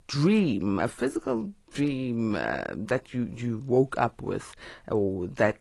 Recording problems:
garbled, watery; slightly; nothing above 11 kHz

